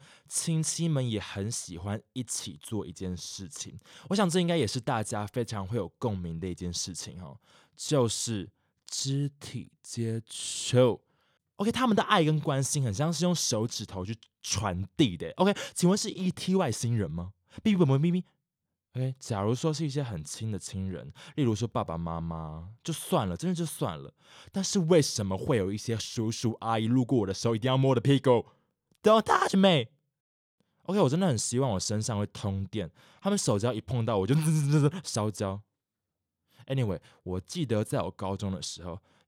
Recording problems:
none

